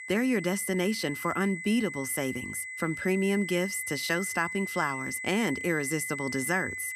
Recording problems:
high-pitched whine; loud; throughout; 2 kHz, 6 dB below the speech

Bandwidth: 14.5 kHz